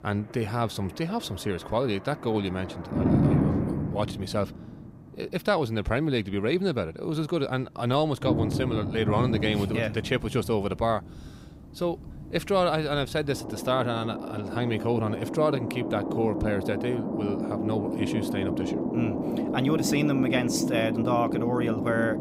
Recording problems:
rain or running water; loud; throughout; 1 dB below the speech

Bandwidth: 15.5 kHz